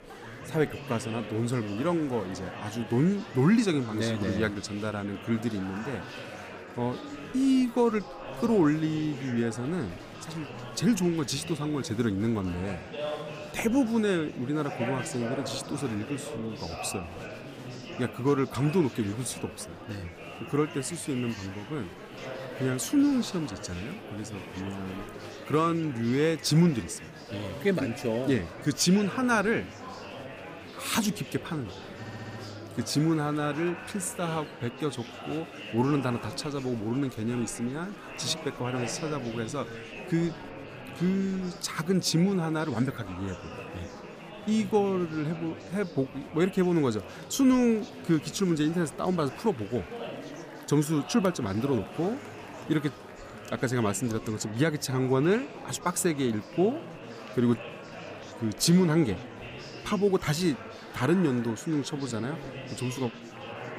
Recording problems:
murmuring crowd; noticeable; throughout; 10 dB below the speech
audio stuttering; at 32 s

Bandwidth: 15 kHz